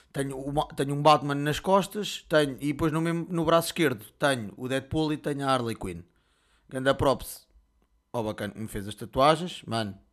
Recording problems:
none

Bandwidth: 13.5 kHz